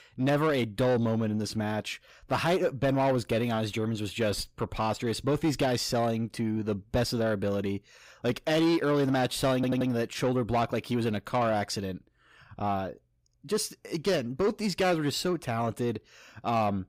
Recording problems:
distortion; slight; 10 dB below the speech
audio stuttering; at 9.5 s

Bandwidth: 15.5 kHz